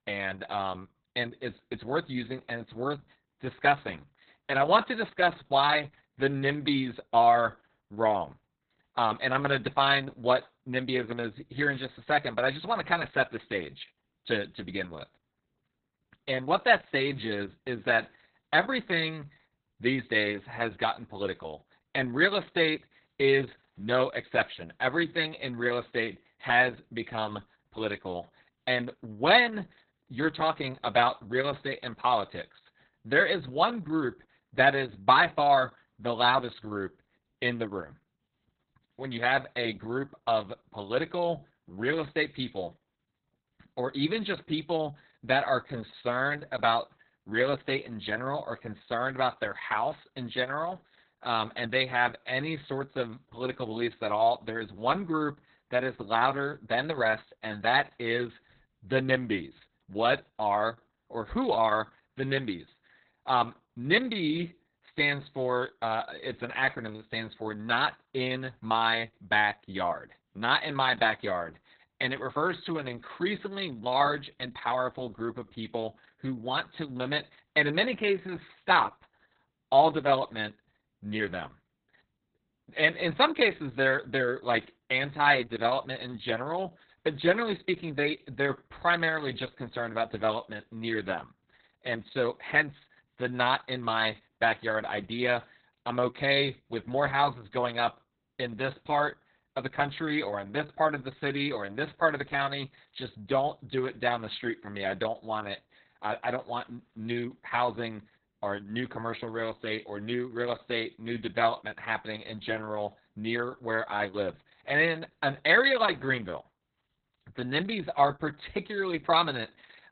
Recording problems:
garbled, watery; badly; nothing above 4 kHz

